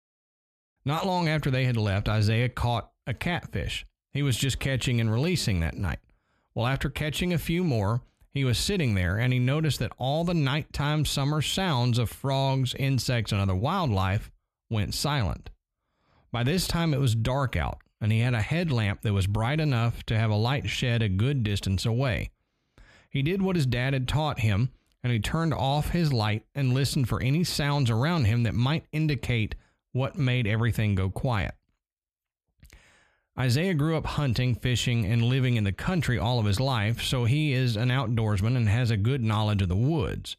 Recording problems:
none

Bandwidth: 14.5 kHz